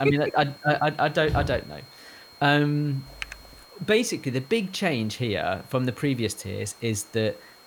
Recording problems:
high-pitched whine; faint; throughout; 4 kHz, 25 dB below the speech
hiss; faint; throughout; 25 dB below the speech
abrupt cut into speech; at the start
footsteps; noticeable; at 1.5 s; peak 5 dB below the speech
keyboard typing; faint; at 3 s; peak 10 dB below the speech

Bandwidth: 18.5 kHz